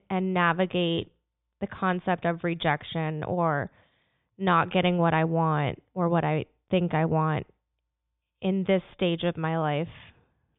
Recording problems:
high frequencies cut off; severe; nothing above 3.5 kHz

